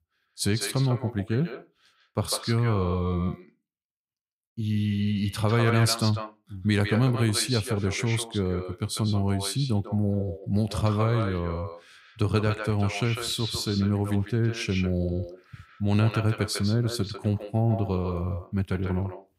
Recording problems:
echo of what is said; strong; throughout; 150 ms later, 10 dB below the speech

